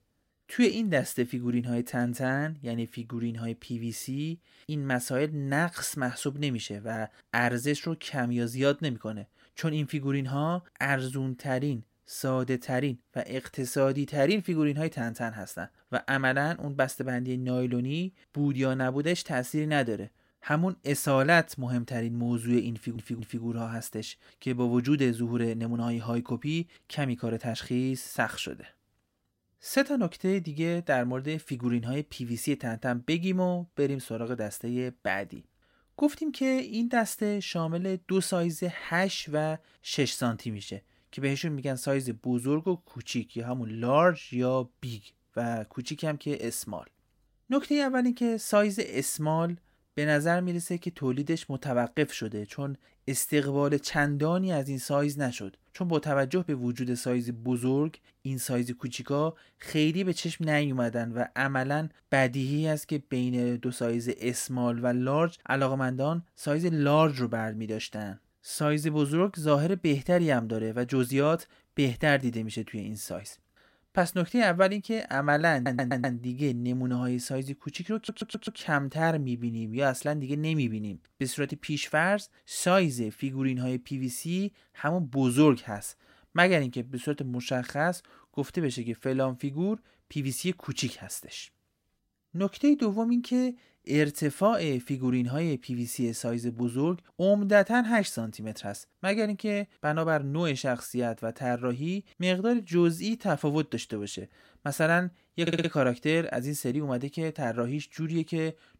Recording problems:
audio stuttering; 4 times, first at 23 s

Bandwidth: 16 kHz